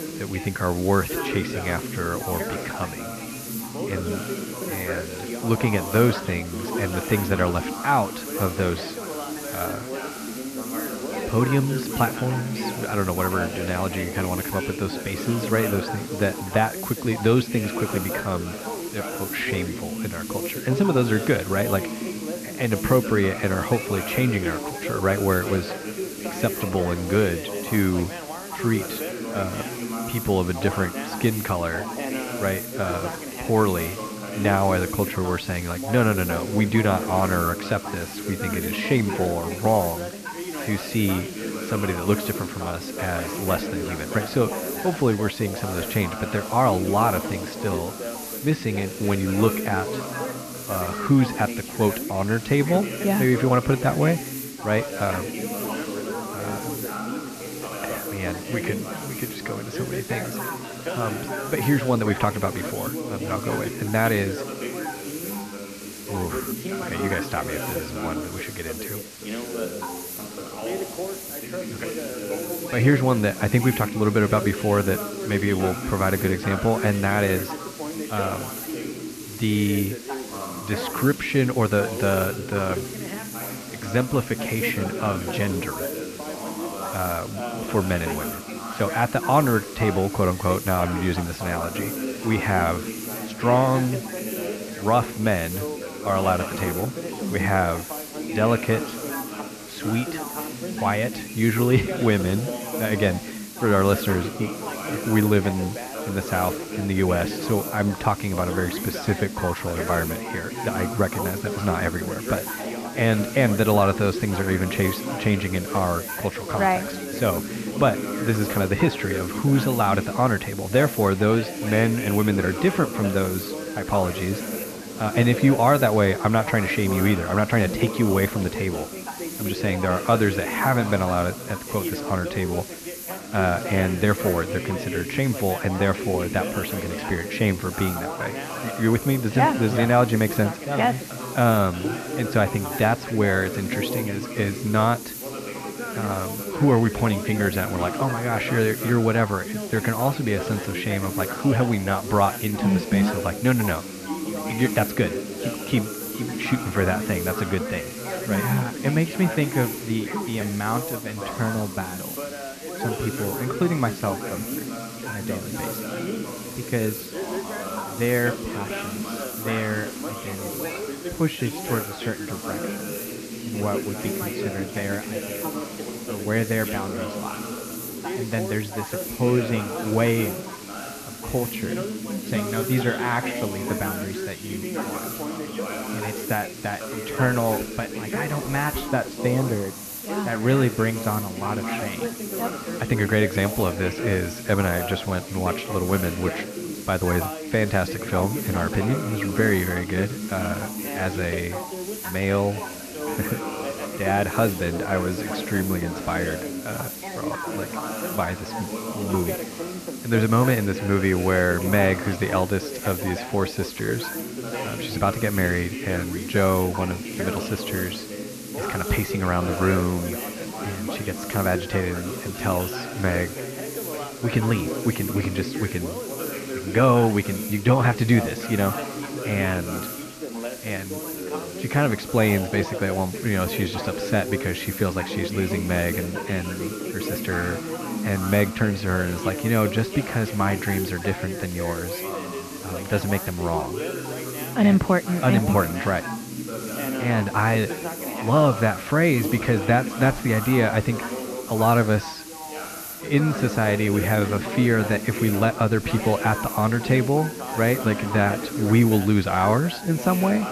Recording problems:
muffled; very; fading above 3 kHz
background chatter; loud; throughout; 3 voices, 8 dB below the speech
hiss; noticeable; throughout; 10 dB below the speech

